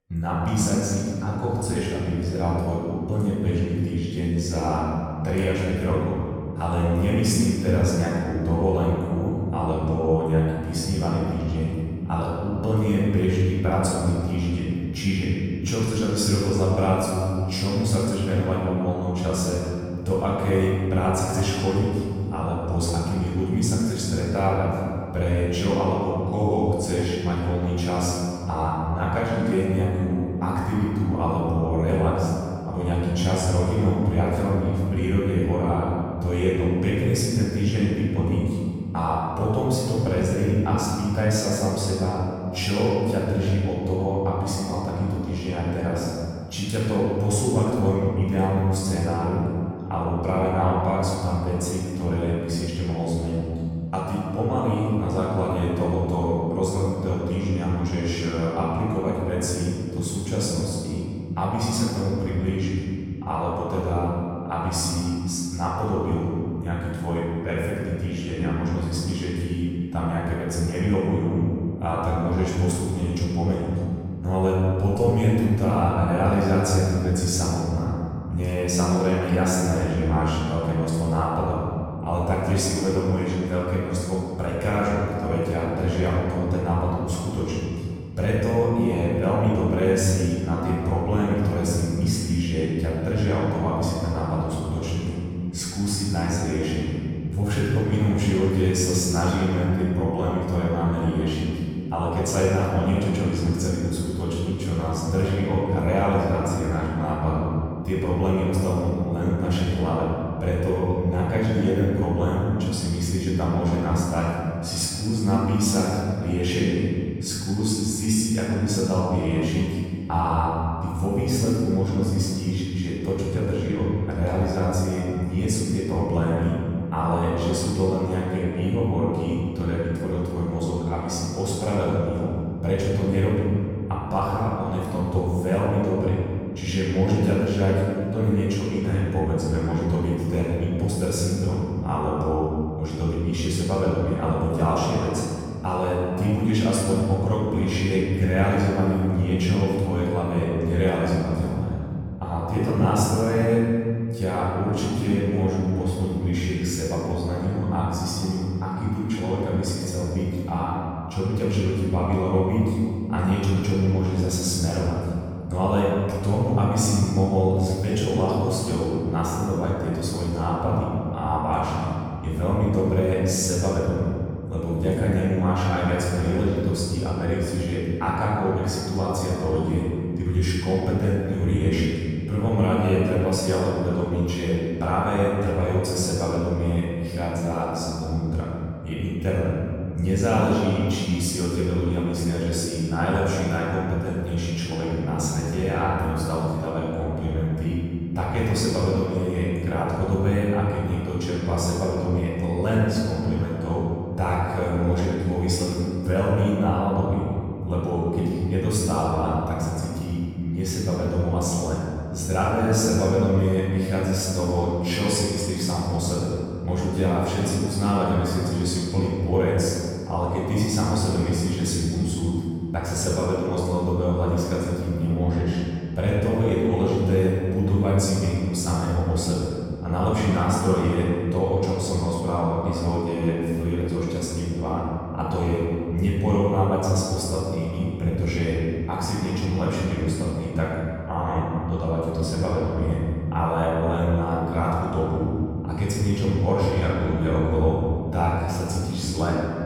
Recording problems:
room echo; strong; dies away in 2.2 s
off-mic speech; far

